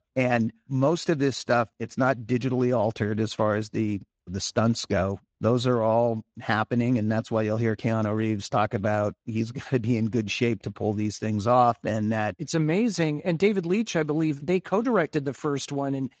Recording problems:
garbled, watery; slightly; nothing above 7.5 kHz

